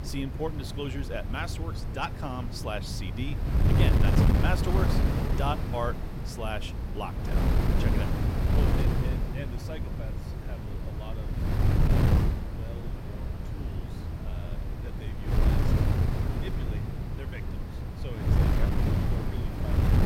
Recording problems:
wind noise on the microphone; heavy; as loud as the speech

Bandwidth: 16 kHz